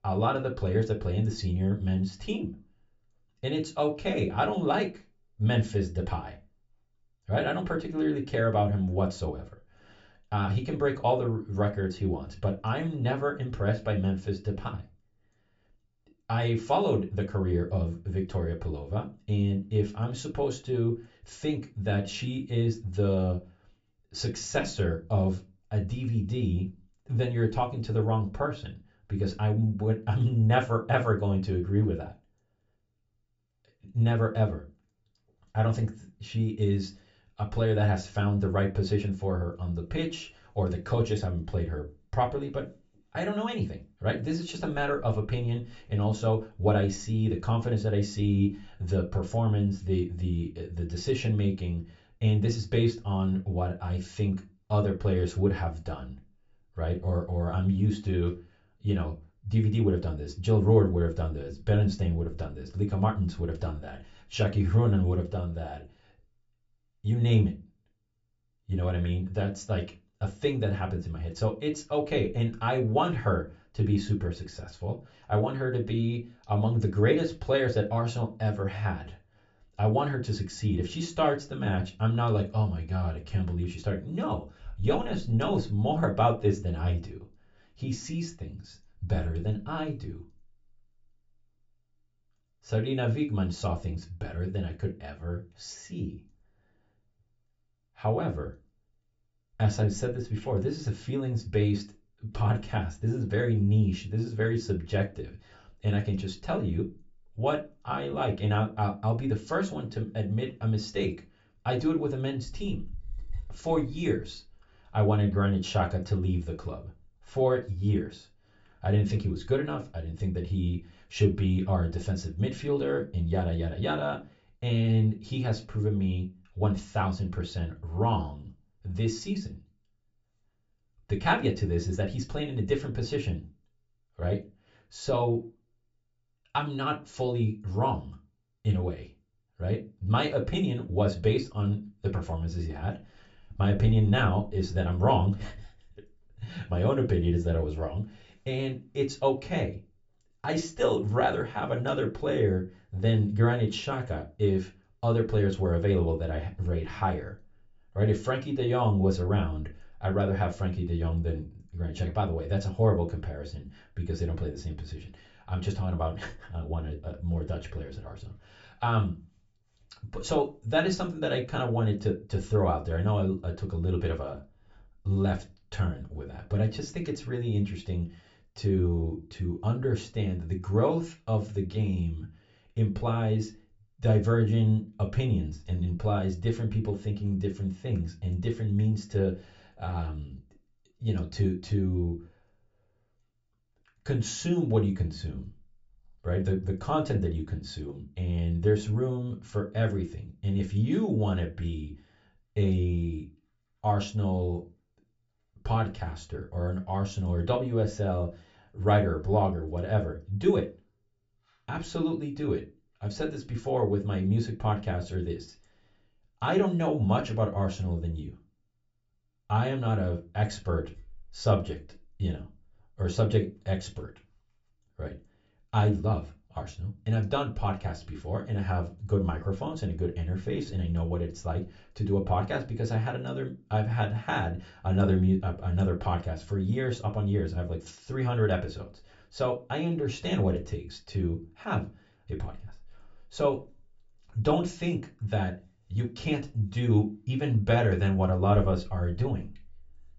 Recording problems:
high frequencies cut off; noticeable; nothing above 7.5 kHz
room echo; very slight; dies away in 0.2 s
off-mic speech; somewhat distant

